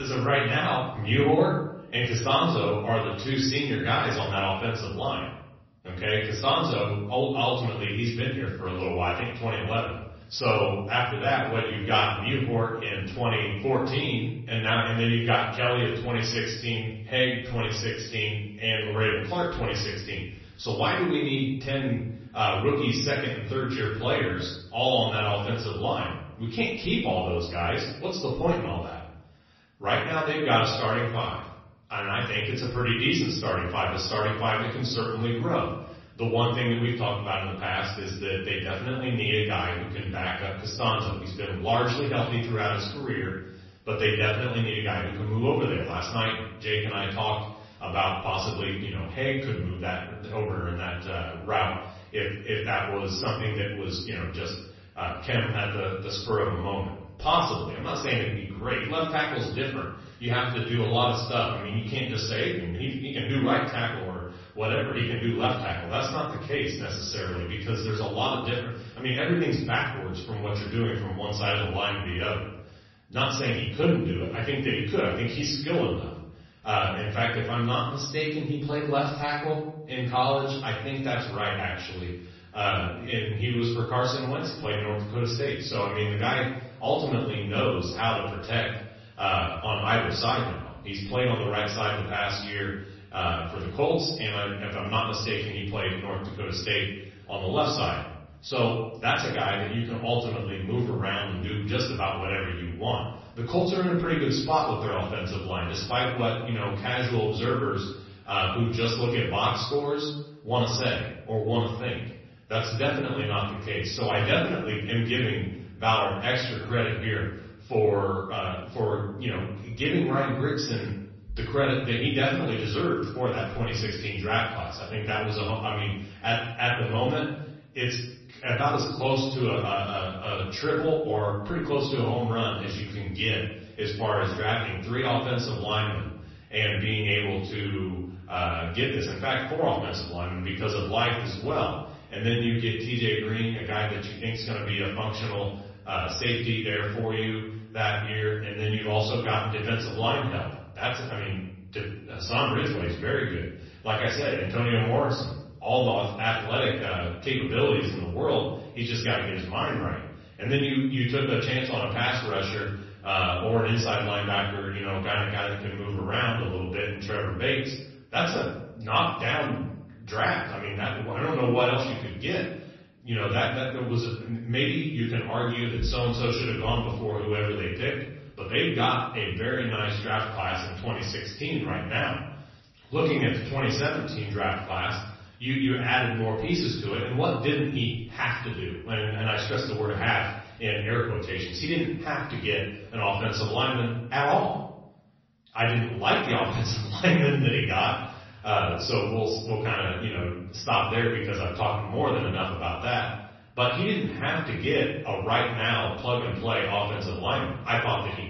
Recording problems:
off-mic speech; far
room echo; noticeable; dies away in 0.7 s
garbled, watery; slightly; nothing above 6 kHz
abrupt cut into speech; at the start

